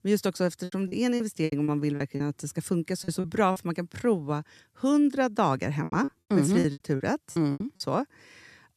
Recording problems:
choppy; very; from 0.5 to 2 s, at 3 s and from 6 to 8 s; 16% of the speech affected

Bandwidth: 14 kHz